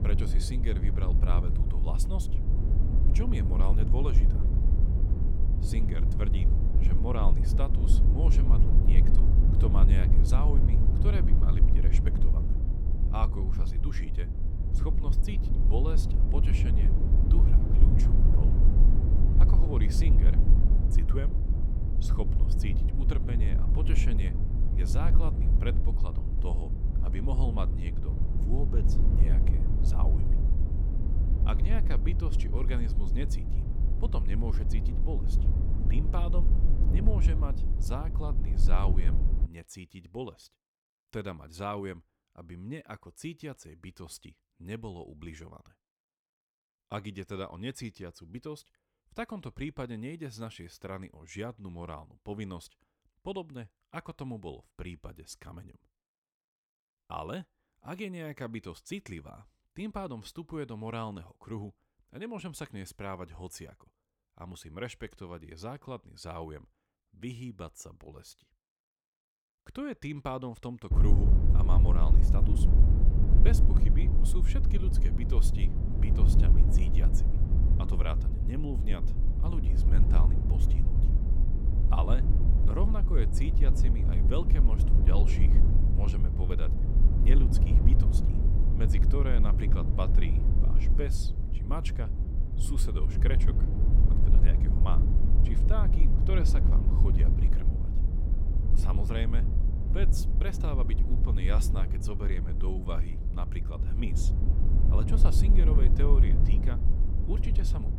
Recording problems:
low rumble; loud; until 39 s and from 1:11 on; 2 dB below the speech

